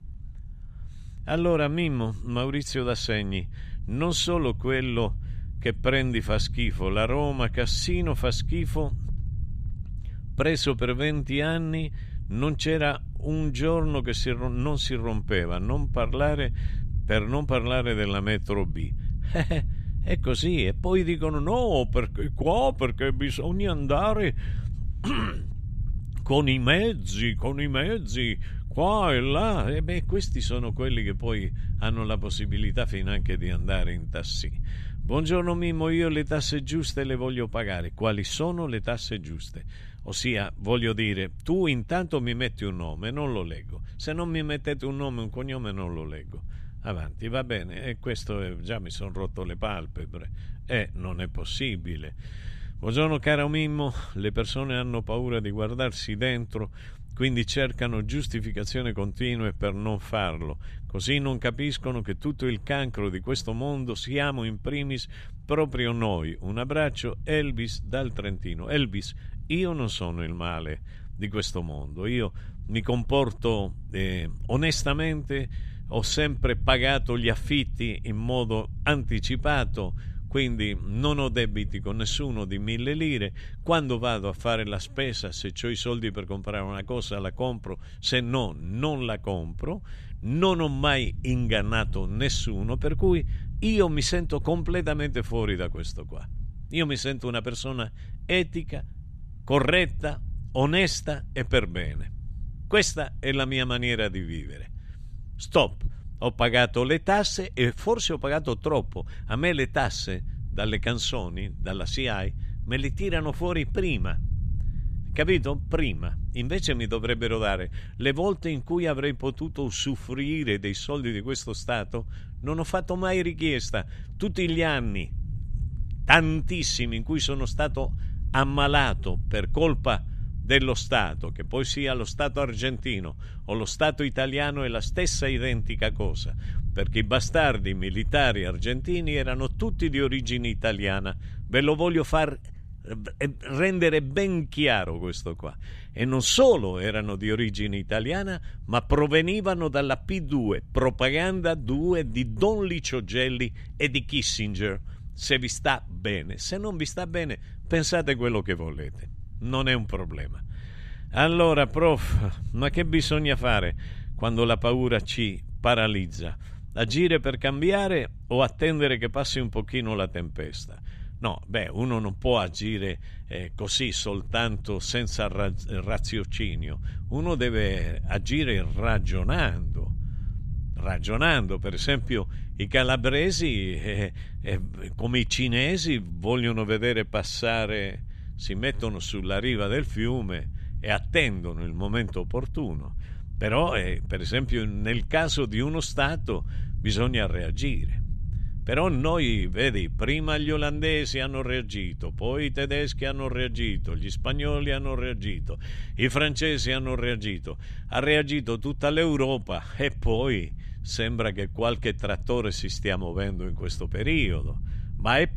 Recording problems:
low rumble; faint; throughout; 25 dB below the speech

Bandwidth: 14.5 kHz